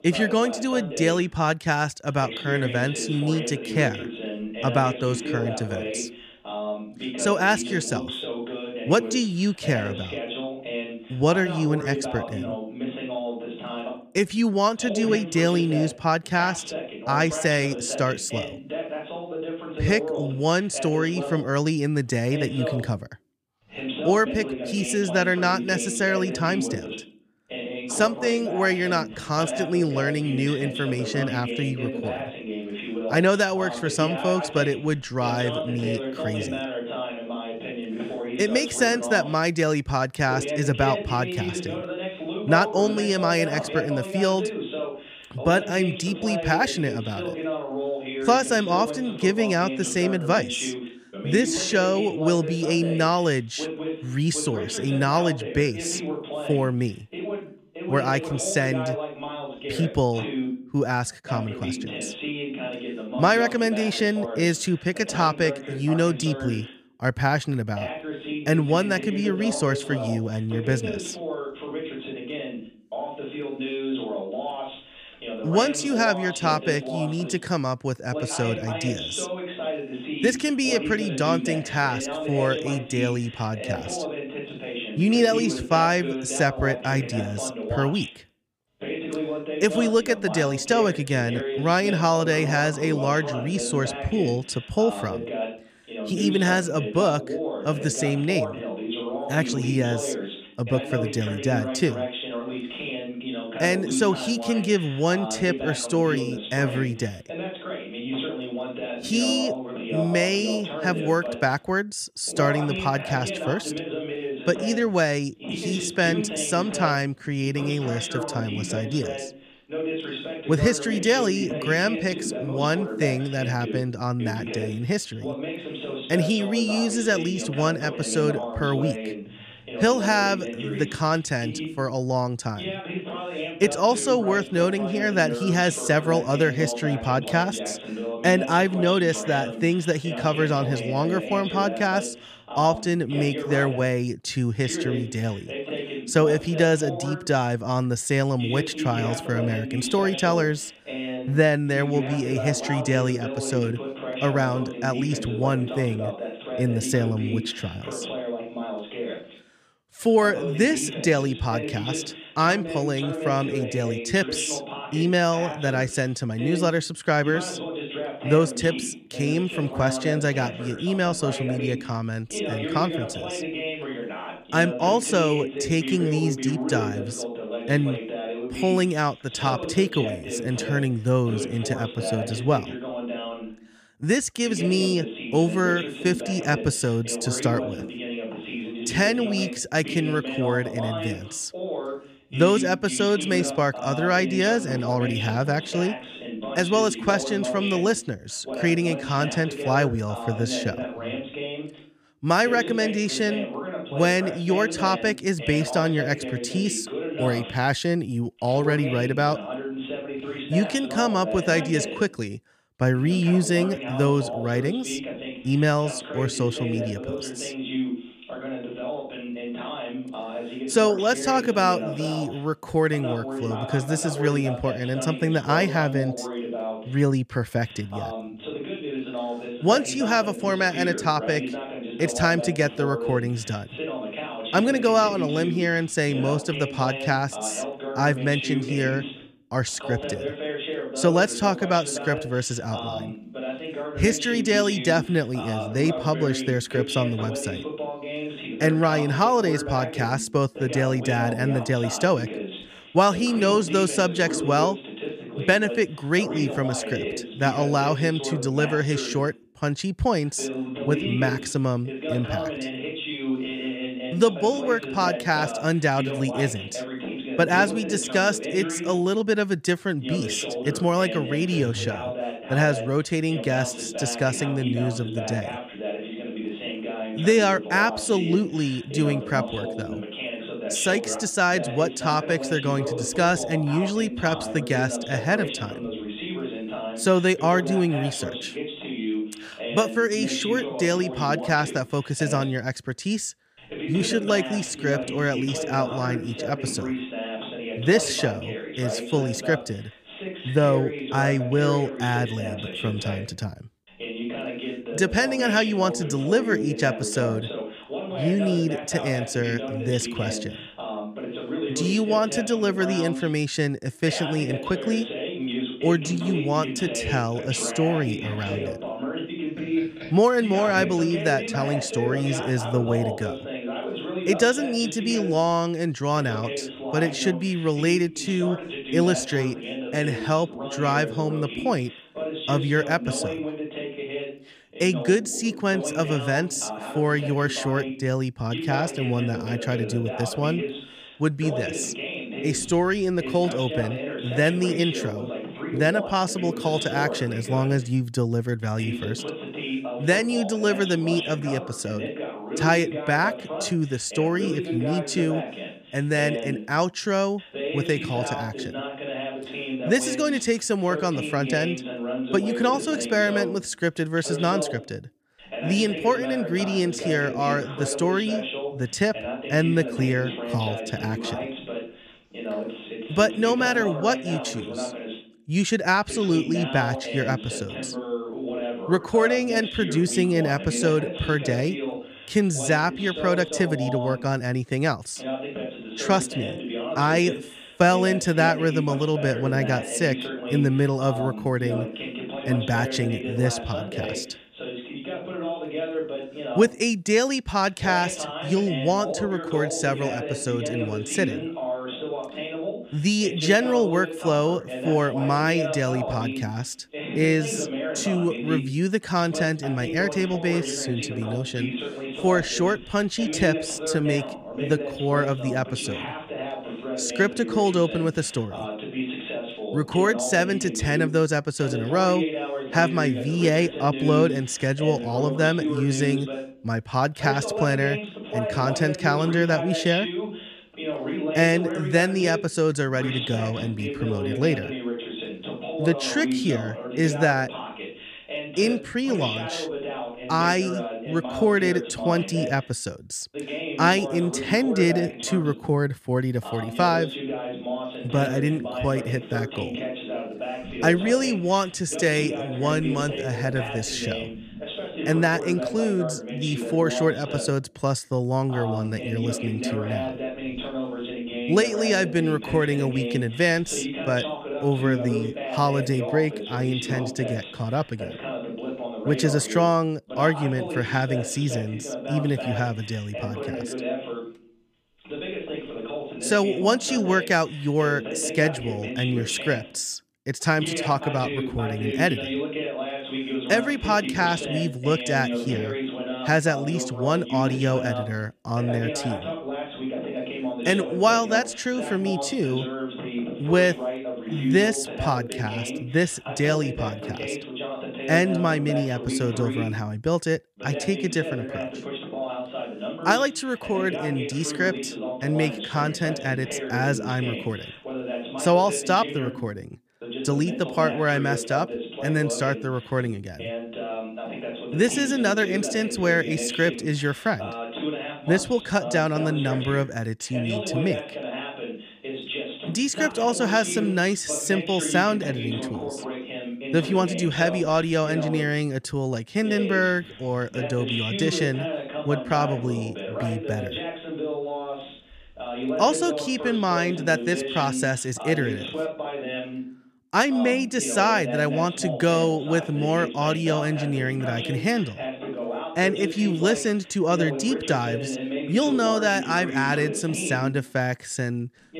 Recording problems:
voice in the background; loud; throughout; 7 dB below the speech

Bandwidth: 15 kHz